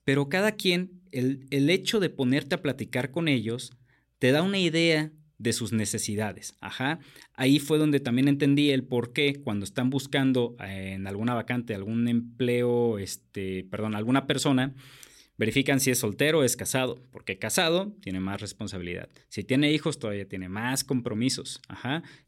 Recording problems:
none

